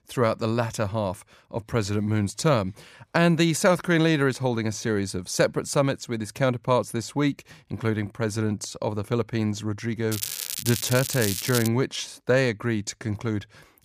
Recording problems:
crackling; loud; from 10 to 12 s; 4 dB below the speech

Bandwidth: 15 kHz